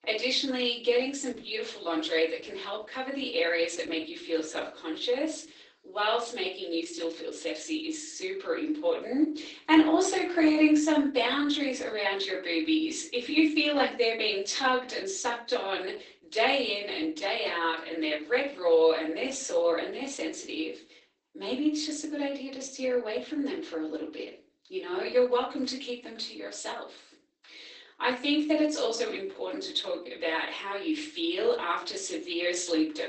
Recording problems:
off-mic speech; far
garbled, watery; badly; nothing above 8 kHz
room echo; slight; dies away in 0.3 s
thin; very slightly; fading below 300 Hz

